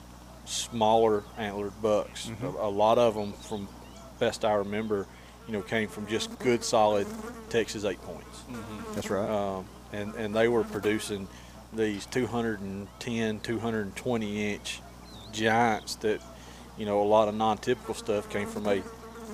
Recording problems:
electrical hum; noticeable; throughout; 60 Hz, 20 dB below the speech

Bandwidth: 15 kHz